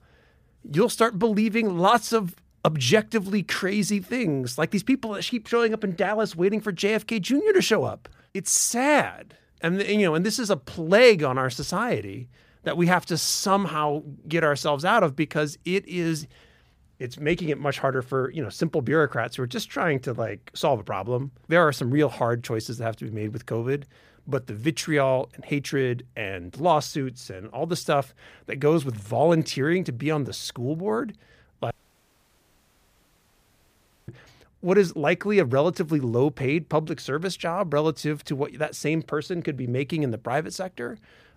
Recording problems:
audio cutting out; at 32 s for 2.5 s

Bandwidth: 15 kHz